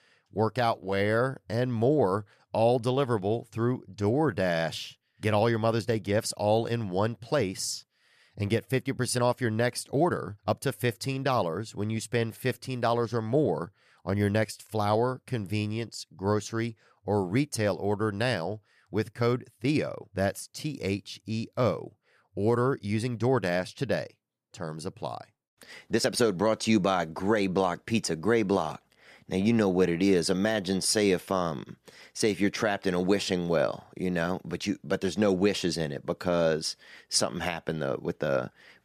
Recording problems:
uneven, jittery; strongly; from 1 to 26 s

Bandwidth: 14.5 kHz